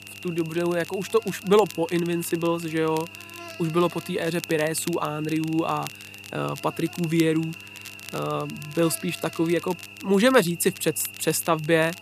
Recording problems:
electrical hum; noticeable; throughout; 50 Hz, 15 dB below the speech
crackle, like an old record; noticeable; 20 dB below the speech

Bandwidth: 14.5 kHz